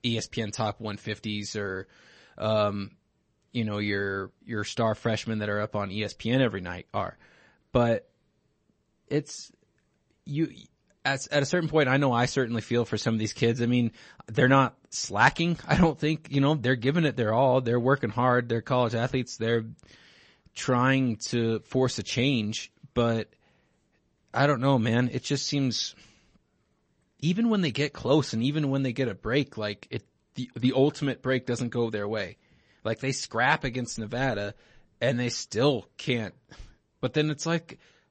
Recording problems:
garbled, watery; slightly; nothing above 8 kHz

